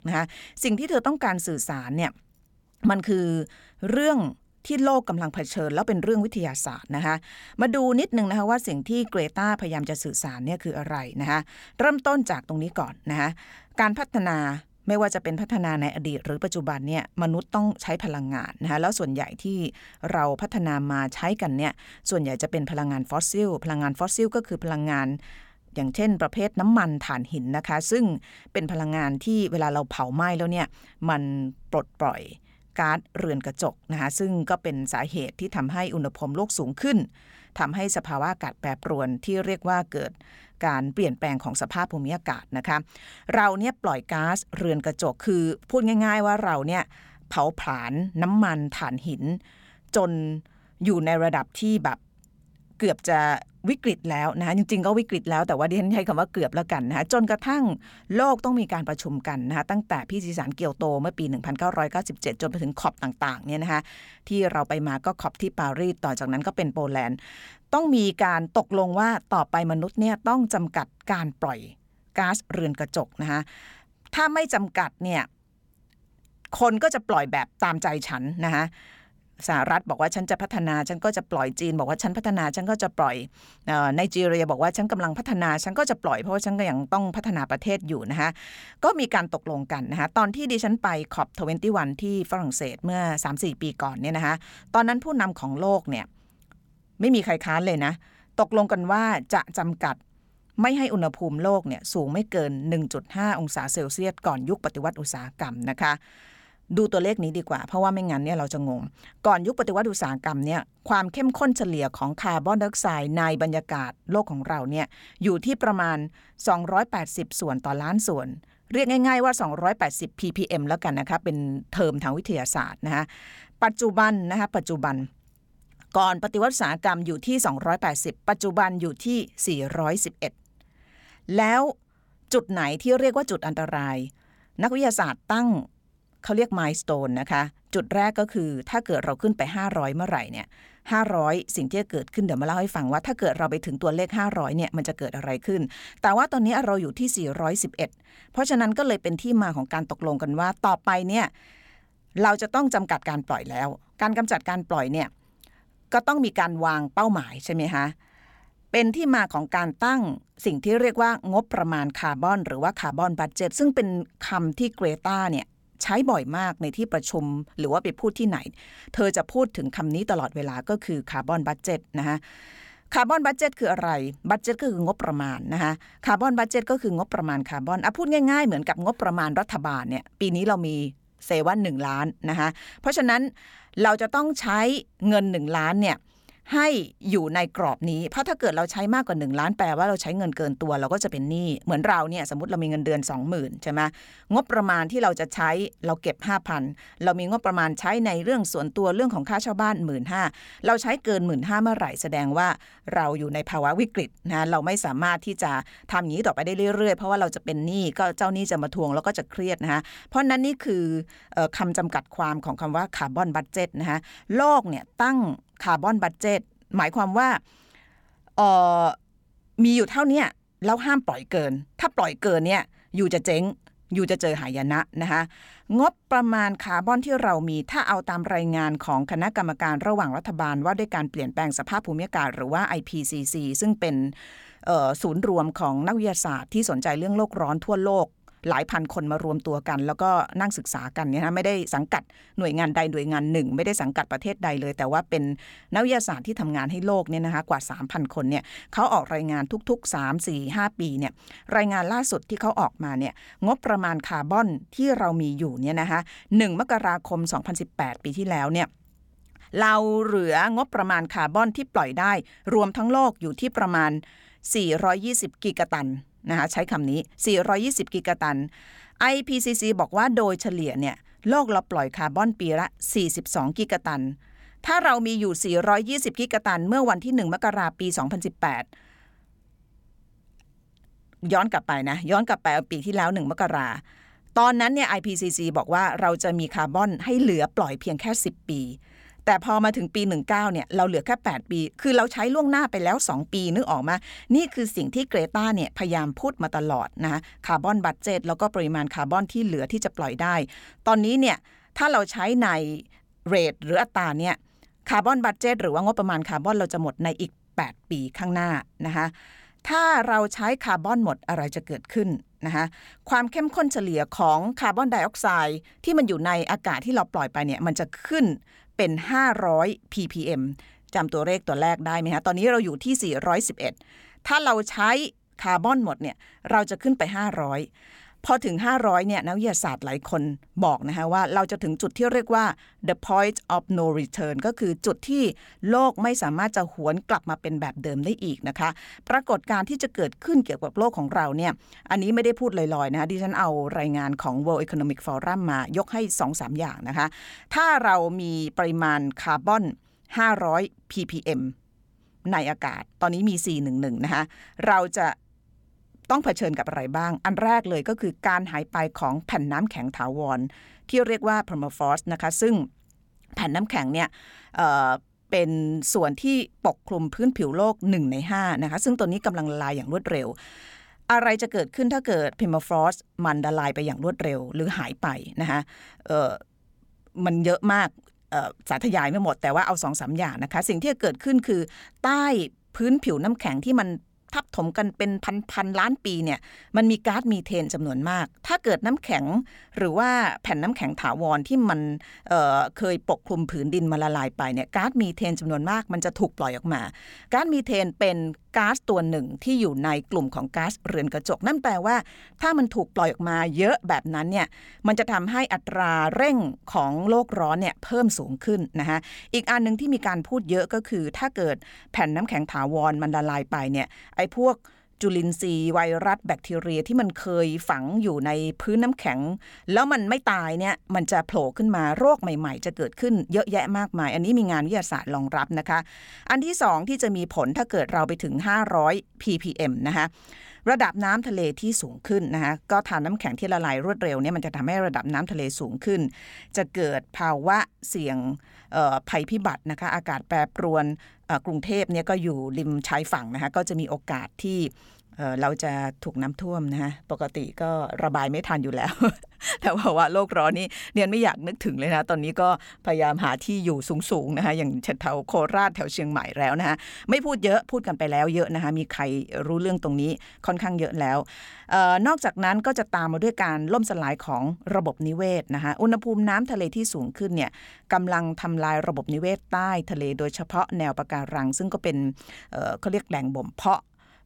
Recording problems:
none

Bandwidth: 17.5 kHz